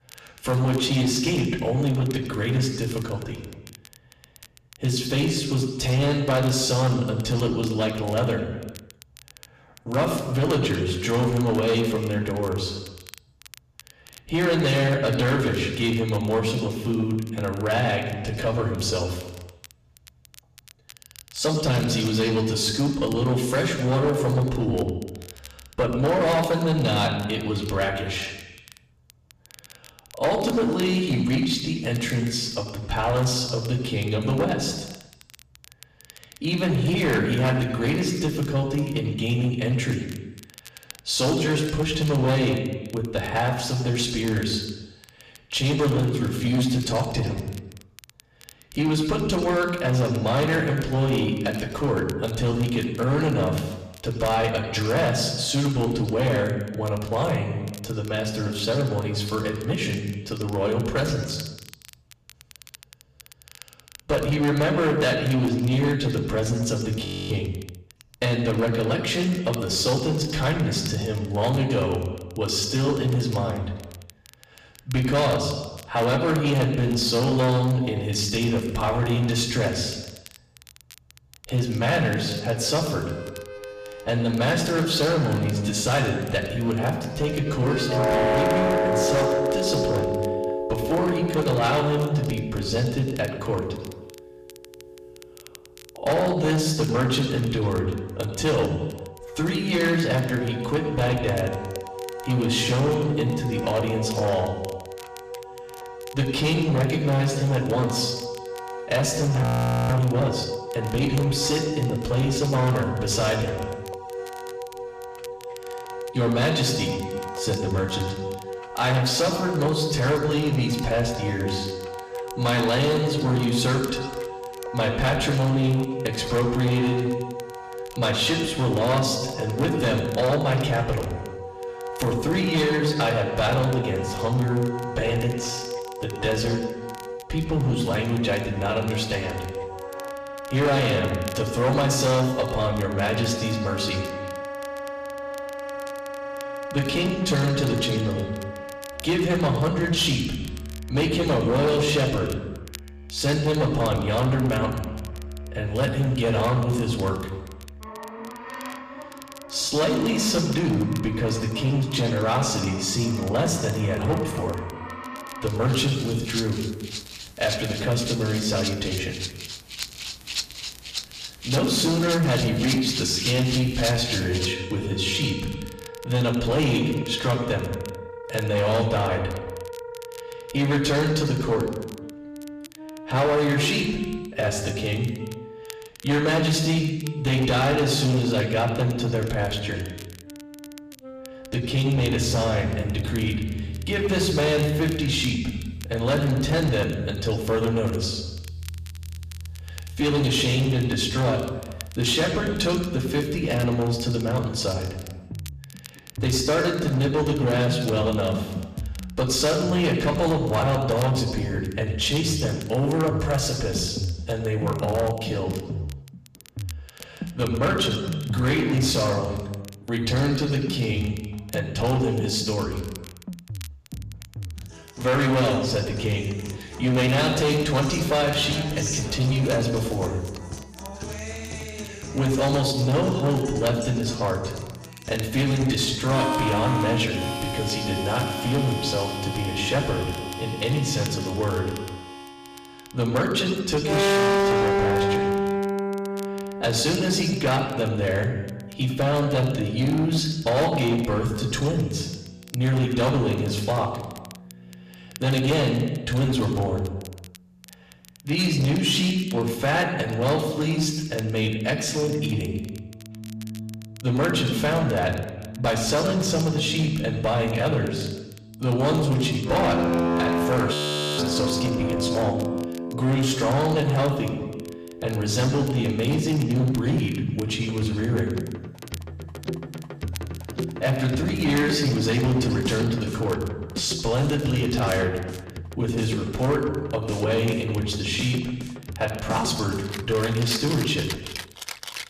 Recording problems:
off-mic speech; far
room echo; noticeable; dies away in 1.1 s
distortion; slight; 9% of the sound clipped
background music; loud; from 1:22 on; 9 dB below the speech
crackle, like an old record; faint; 25 dB below the speech
audio freezing; at 1:07, at 1:49 and at 4:31

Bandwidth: 14.5 kHz